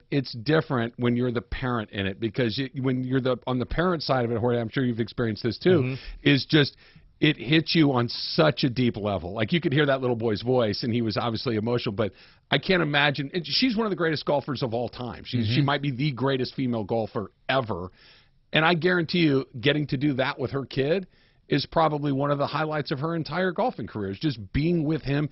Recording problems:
garbled, watery; badly; nothing above 5.5 kHz

